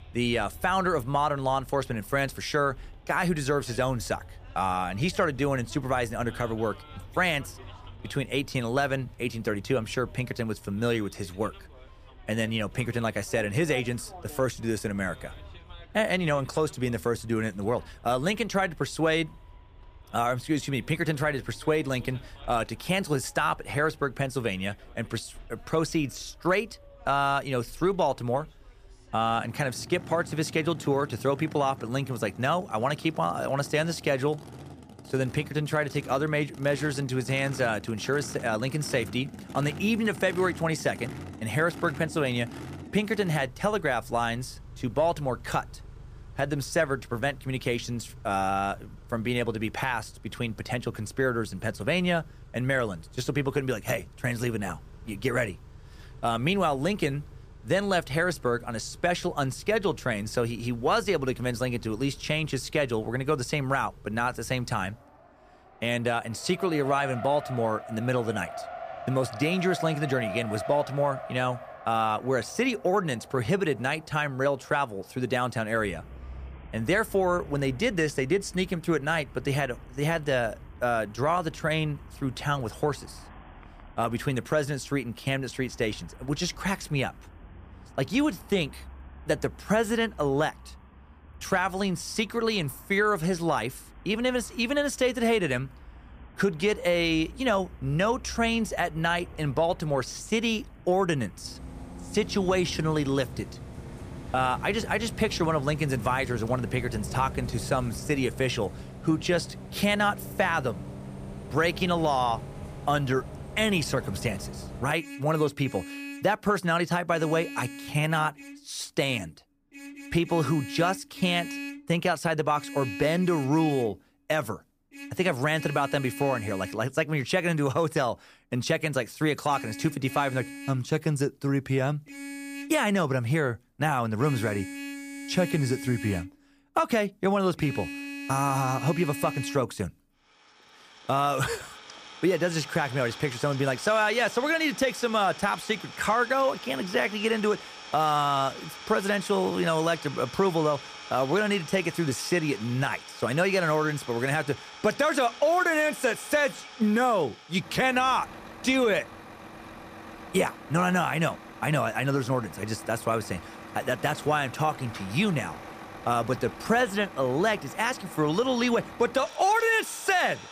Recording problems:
traffic noise; noticeable; throughout; 15 dB below the speech

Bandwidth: 15 kHz